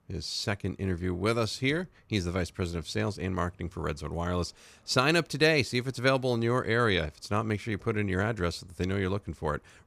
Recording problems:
none

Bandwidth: 15 kHz